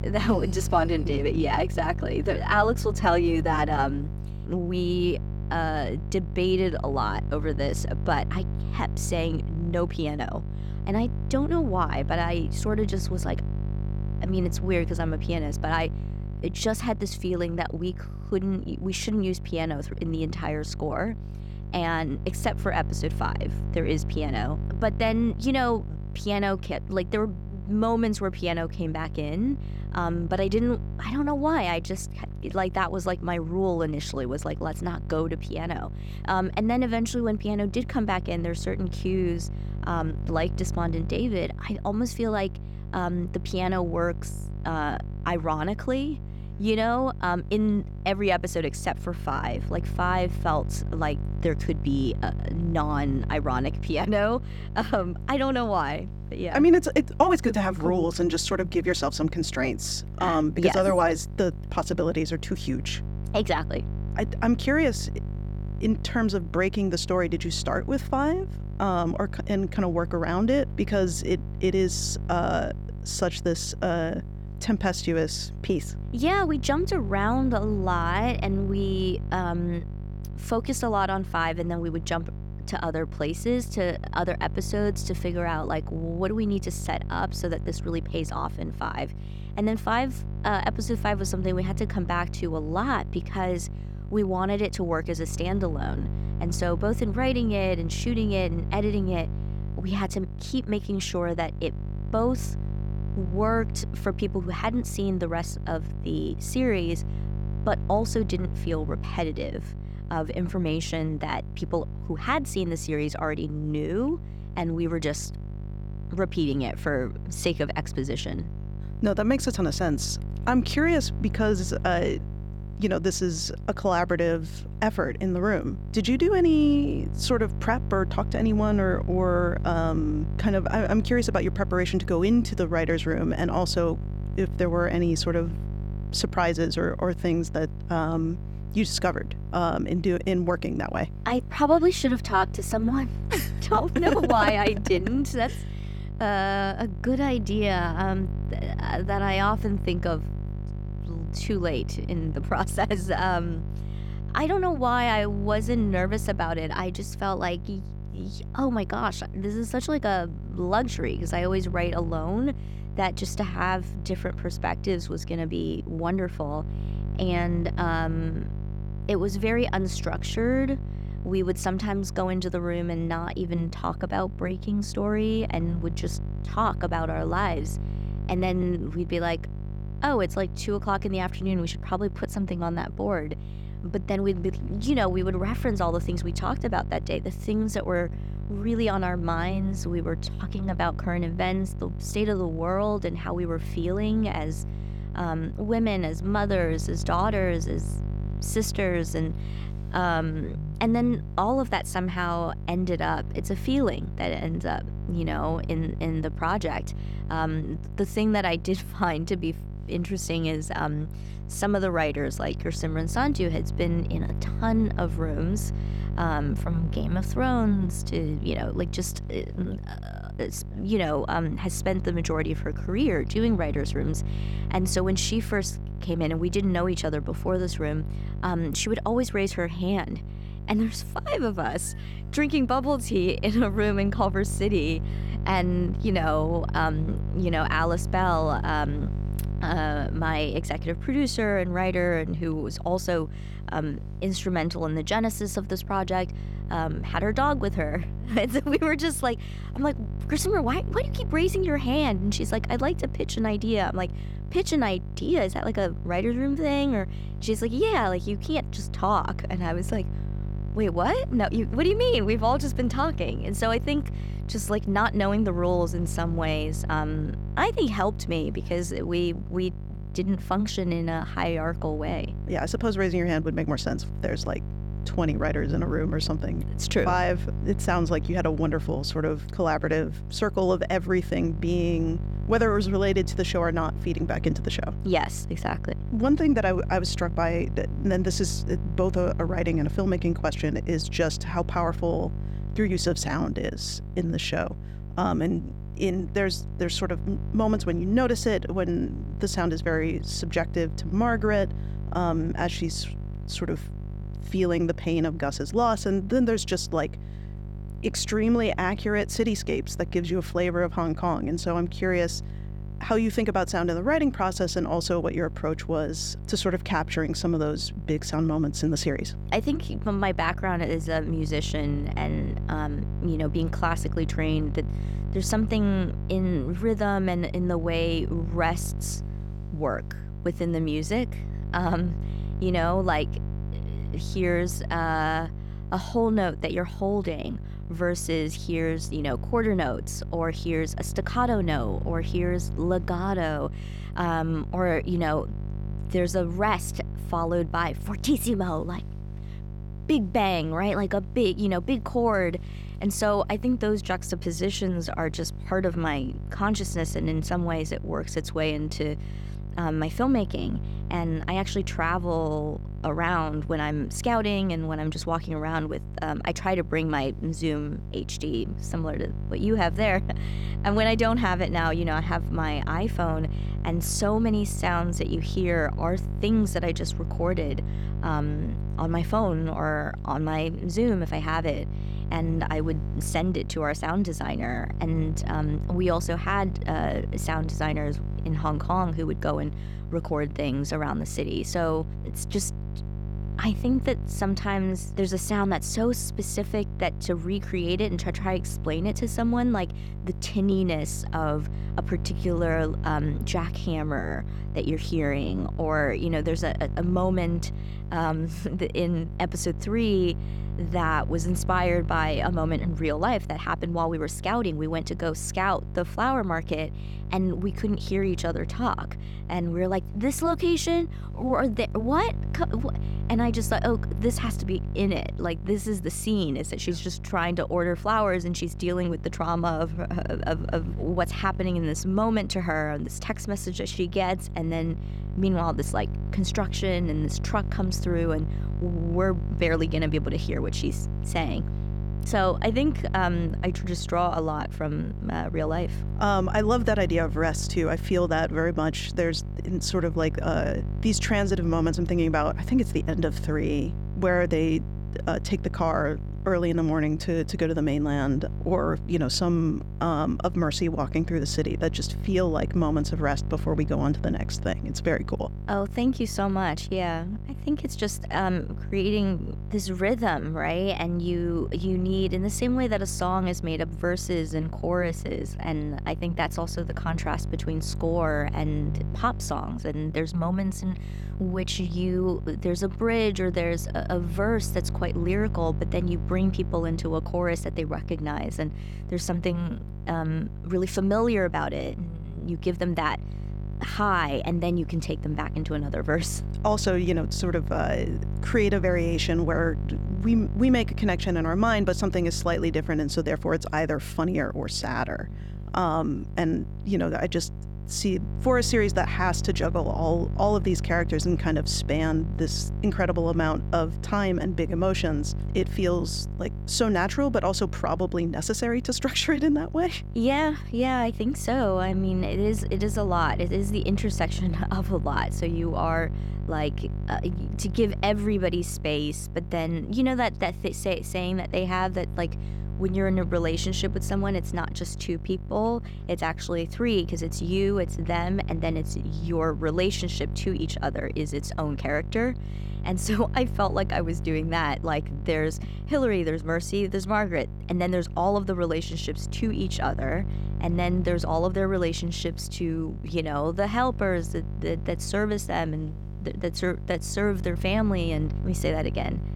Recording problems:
electrical hum; noticeable; throughout; 50 Hz, 15 dB below the speech

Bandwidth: 17.5 kHz